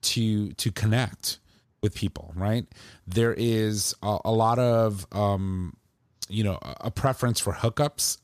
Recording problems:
none

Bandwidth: 14.5 kHz